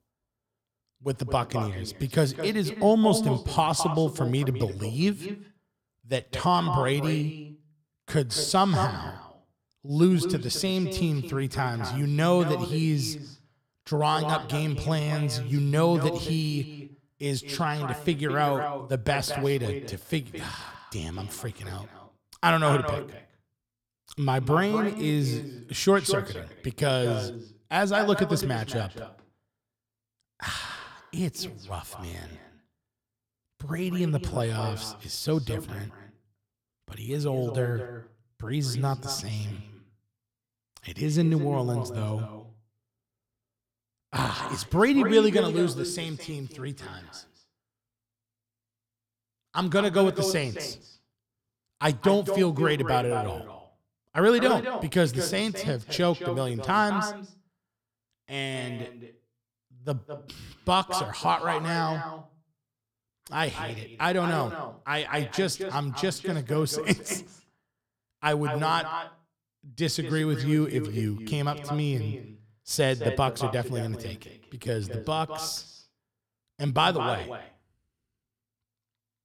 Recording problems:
echo of what is said; strong; throughout; 210 ms later, 9 dB below the speech

